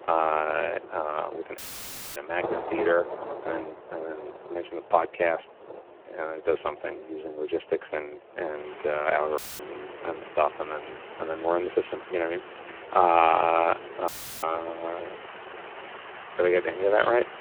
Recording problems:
phone-call audio; poor line
rain or running water; noticeable; throughout; 15 dB below the speech
audio cutting out; filled with static; at 1.5 s for 0.5 s, at 9.5 s and at 14 s

